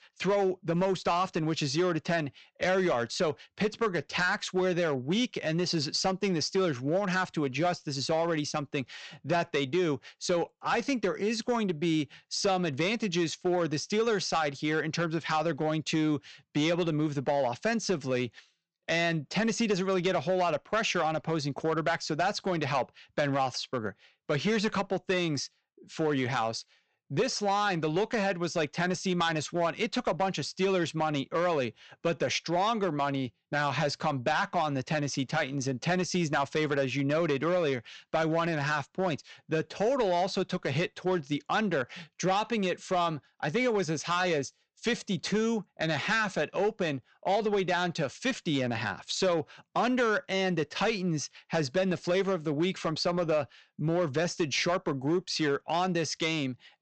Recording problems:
high frequencies cut off; noticeable; nothing above 8 kHz
distortion; slight; 5% of the sound clipped

